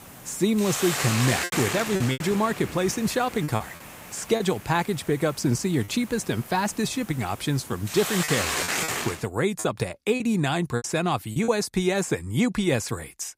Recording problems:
hiss; loud; until 9 s; 3 dB below the speech
choppy; very; from 2 to 4.5 s, at 6 s and from 8 to 11 s; 7% of the speech affected

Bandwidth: 15.5 kHz